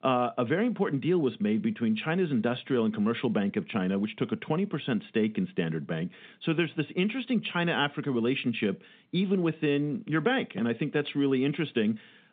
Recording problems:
phone-call audio; nothing above 3.5 kHz

